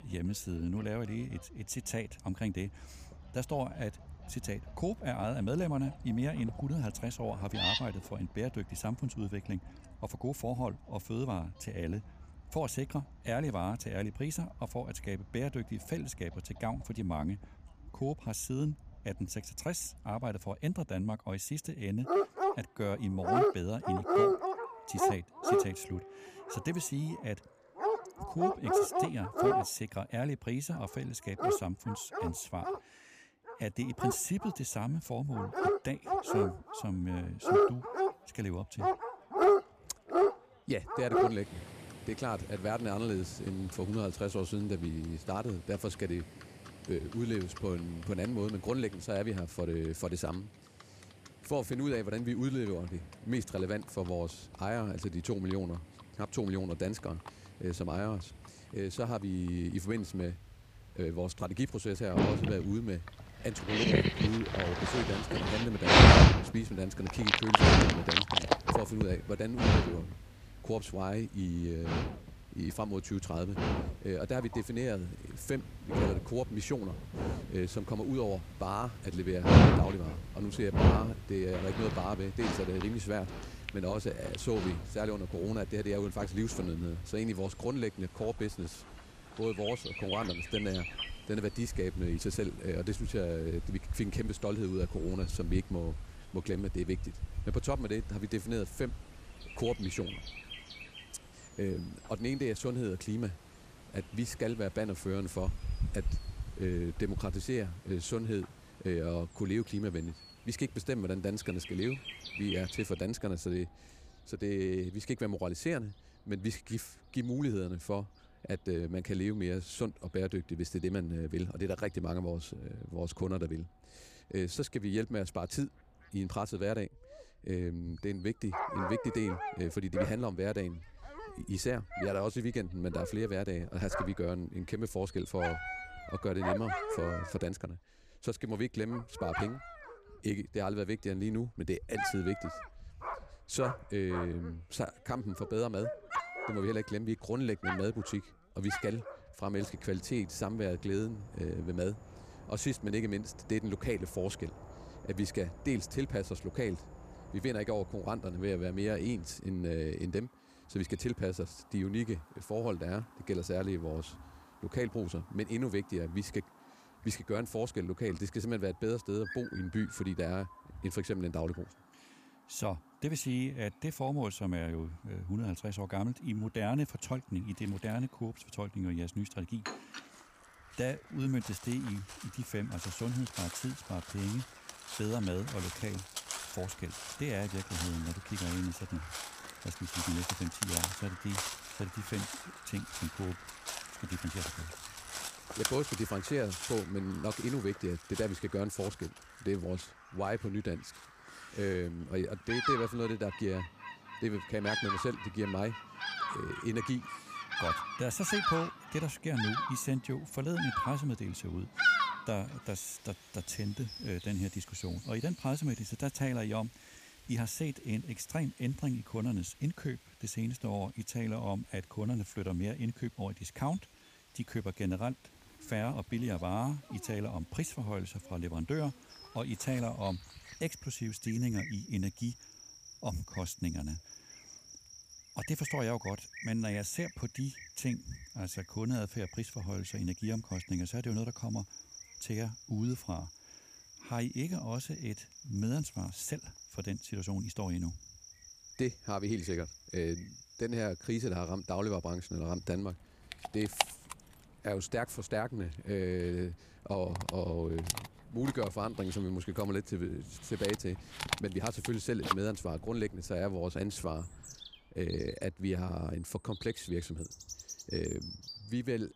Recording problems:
animal sounds; very loud; throughout; 3 dB above the speech

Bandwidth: 15 kHz